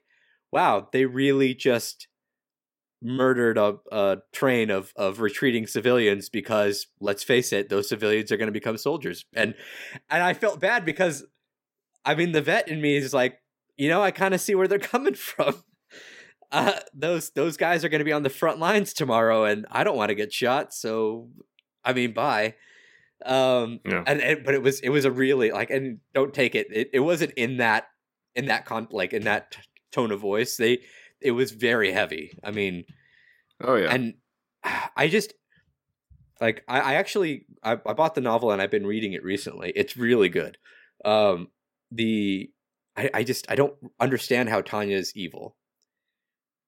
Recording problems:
none

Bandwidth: 16.5 kHz